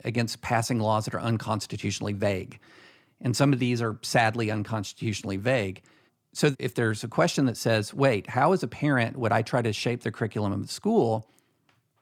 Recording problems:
none

